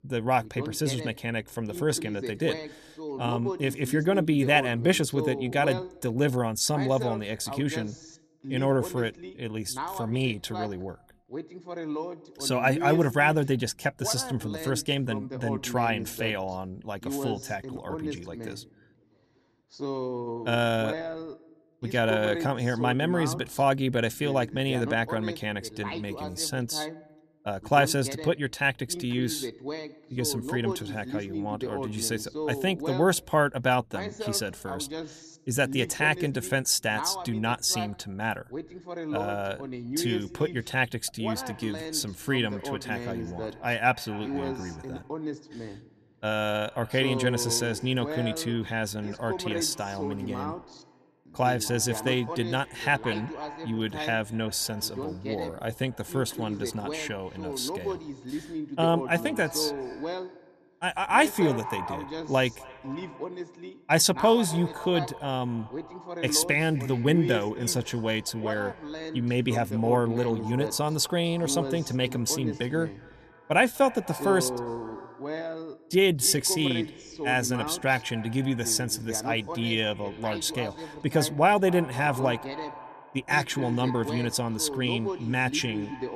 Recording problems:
echo of what is said; faint; from 41 s on; 250 ms later, 20 dB below the speech
voice in the background; loud; throughout; 9 dB below the speech

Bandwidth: 14 kHz